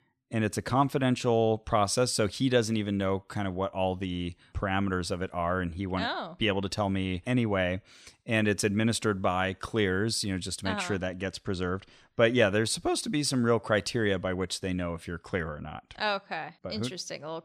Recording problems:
none

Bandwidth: 14 kHz